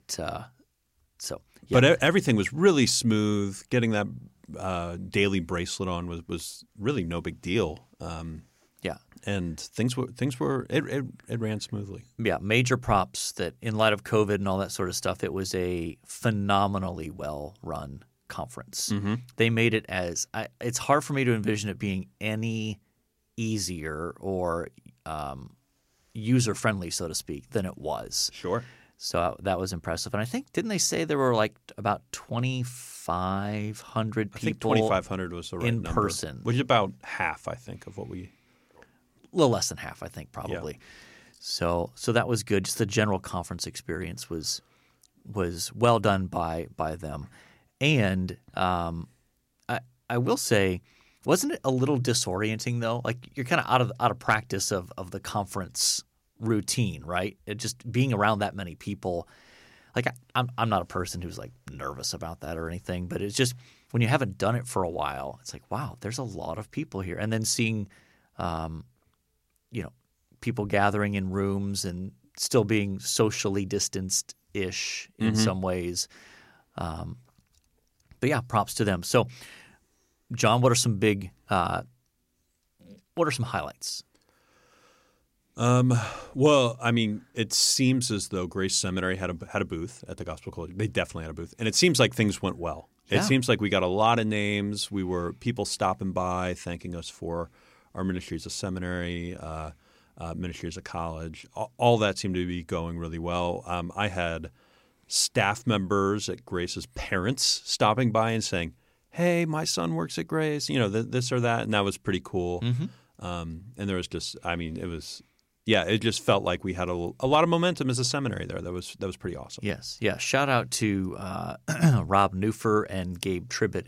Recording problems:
none

